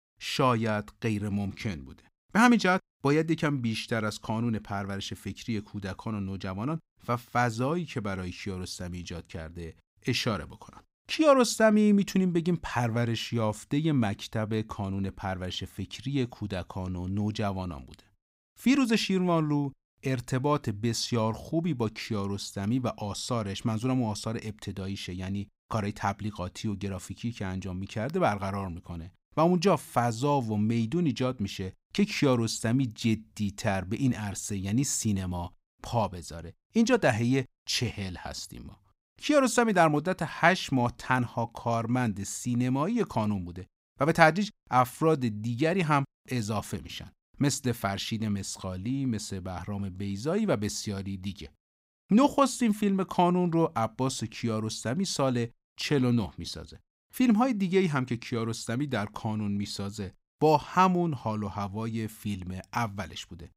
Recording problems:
none

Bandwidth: 15.5 kHz